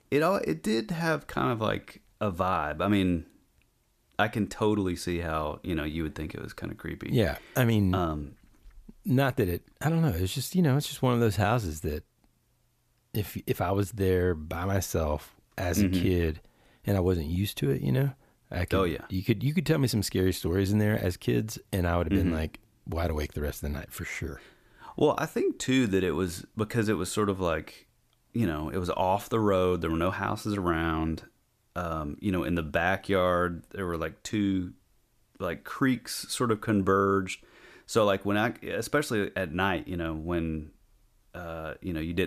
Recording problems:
abrupt cut into speech; at the end

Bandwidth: 14.5 kHz